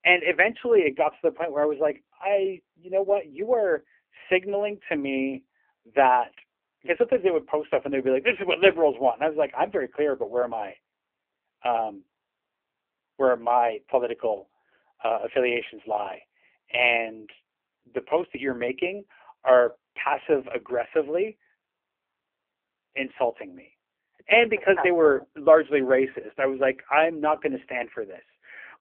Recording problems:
phone-call audio; poor line; nothing above 3 kHz

